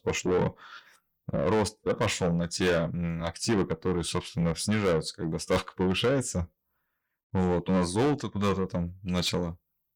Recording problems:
distortion; heavy; 7 dB below the speech

